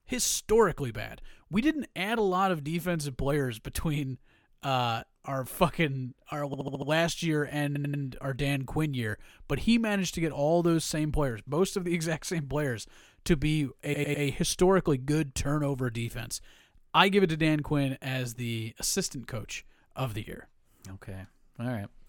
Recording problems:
audio stuttering; at 6.5 s, at 7.5 s and at 14 s

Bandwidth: 17.5 kHz